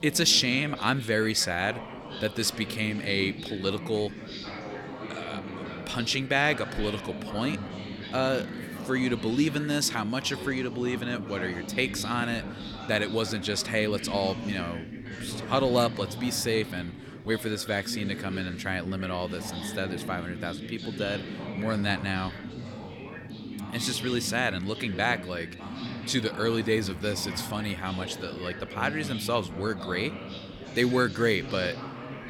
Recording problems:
background chatter; loud; throughout; 4 voices, 9 dB below the speech

